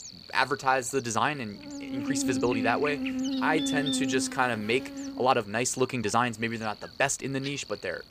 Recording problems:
electrical hum; loud; throughout; 60 Hz, 9 dB below the speech
uneven, jittery; strongly; from 0.5 to 7 s

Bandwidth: 15 kHz